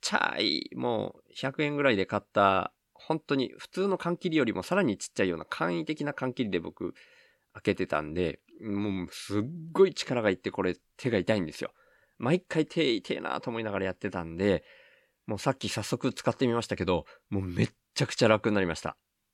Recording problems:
none

